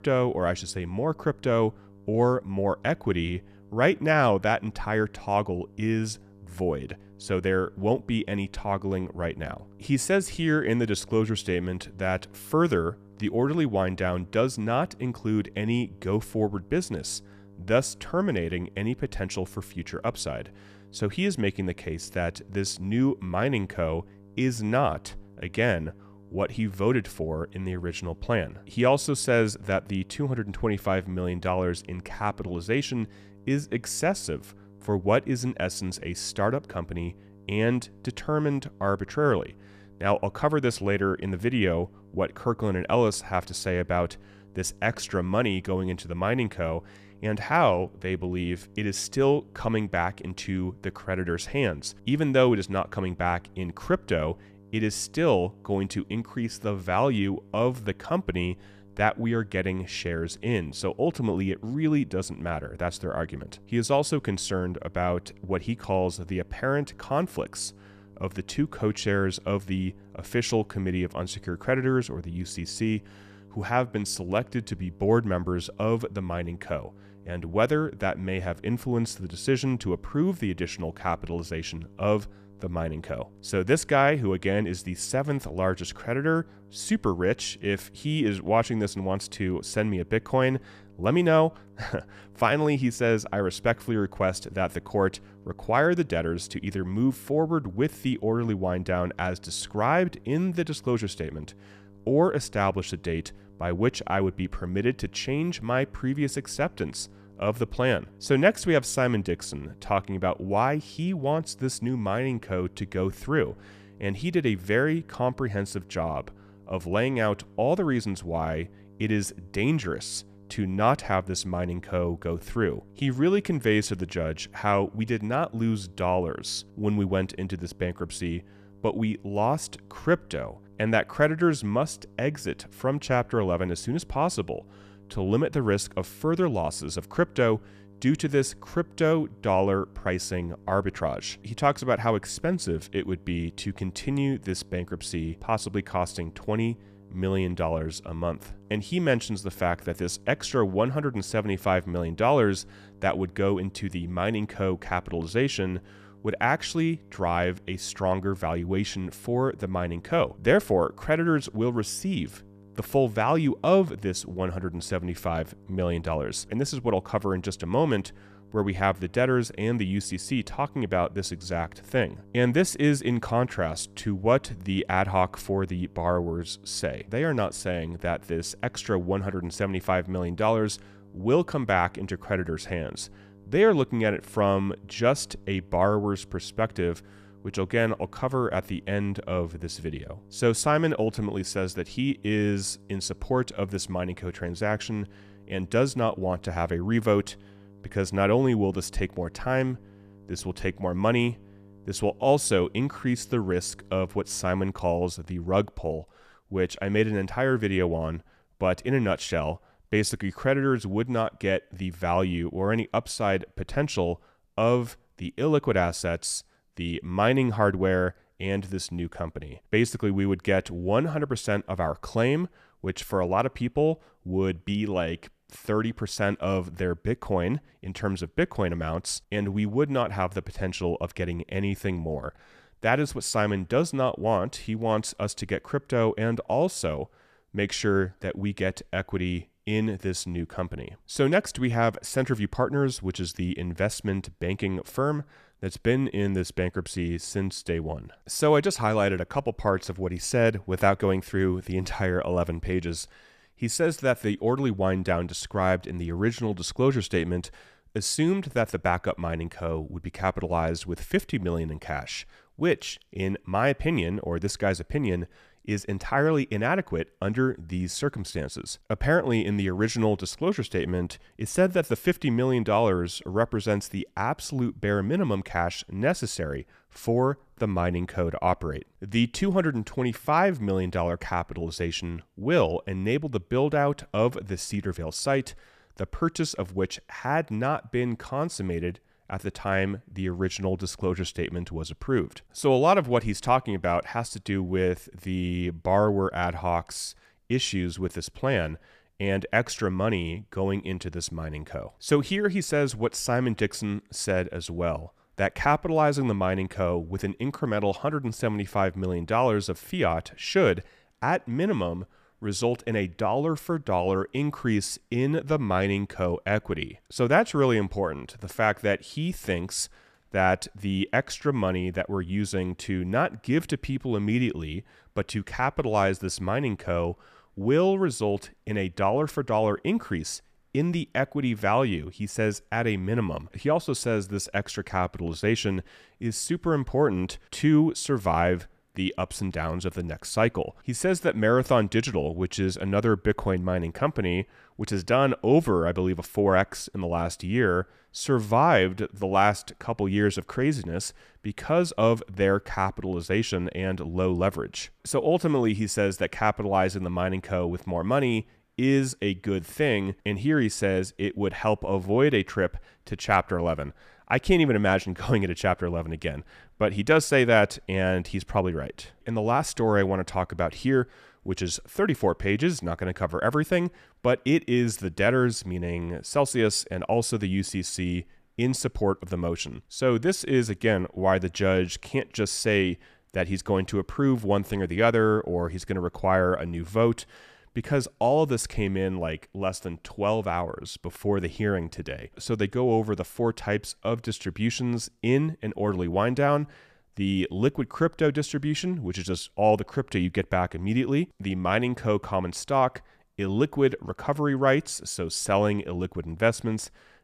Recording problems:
electrical hum; faint; until 3:24; 50 Hz, 30 dB below the speech

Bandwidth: 14.5 kHz